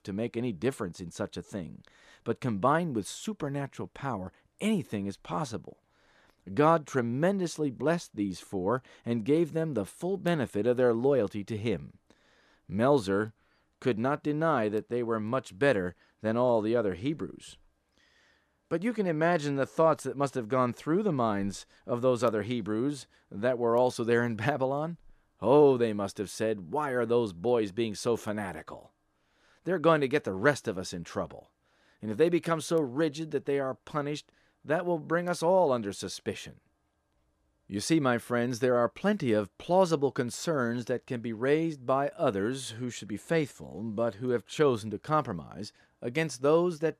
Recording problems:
none

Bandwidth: 14.5 kHz